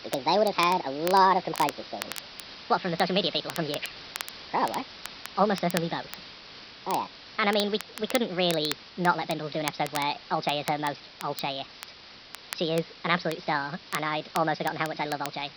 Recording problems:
wrong speed and pitch; too fast and too high; 1.5 times normal speed
high frequencies cut off; noticeable; nothing above 5.5 kHz
hiss; noticeable; throughout; 15 dB below the speech
crackle, like an old record; noticeable; 15 dB below the speech

